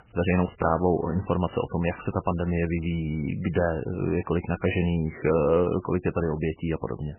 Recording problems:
garbled, watery; badly; nothing above 3 kHz

